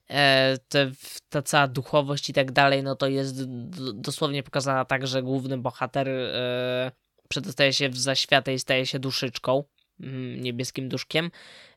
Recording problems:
none

